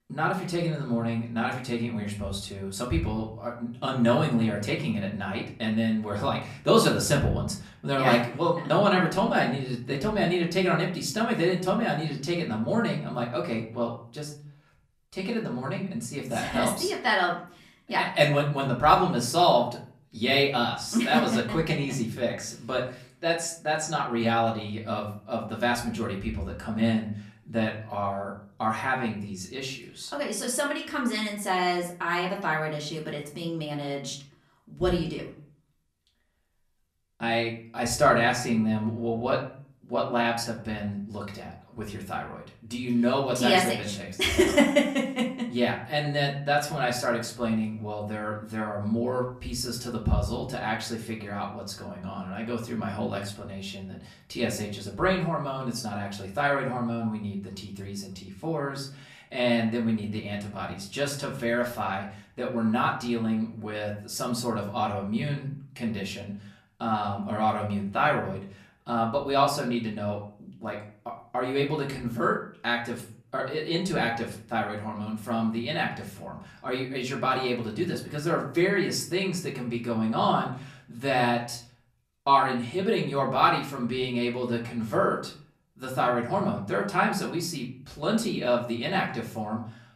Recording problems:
off-mic speech; far
room echo; slight; dies away in 0.4 s

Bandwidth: 14.5 kHz